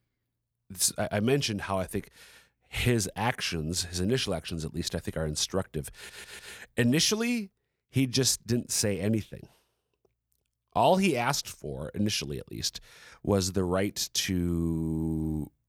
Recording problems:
audio stuttering; at 6 s

